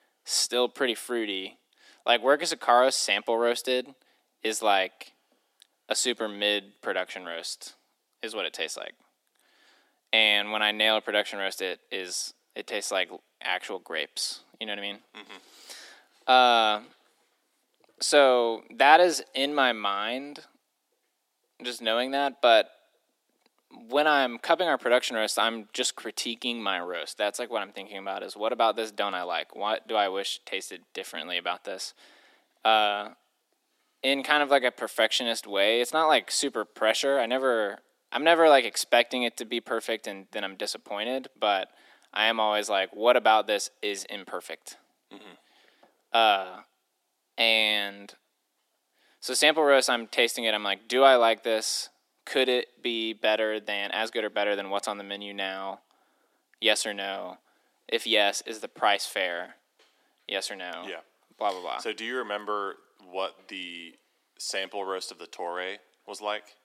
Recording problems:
thin; very; fading below 300 Hz

